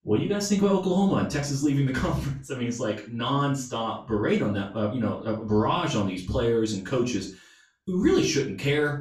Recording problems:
off-mic speech; far
room echo; noticeable; dies away in 0.3 s

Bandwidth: 14 kHz